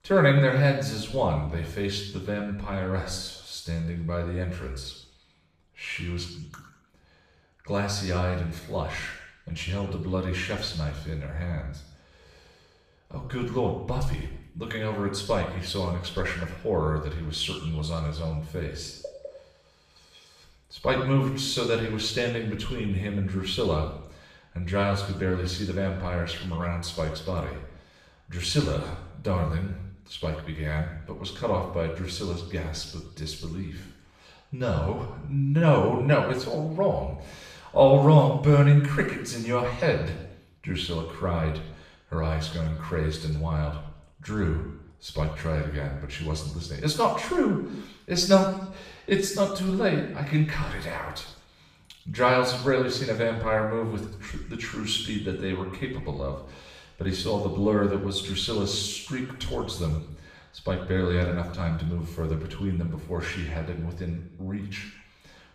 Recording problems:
off-mic speech; far
room echo; noticeable; dies away in 0.7 s

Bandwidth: 15 kHz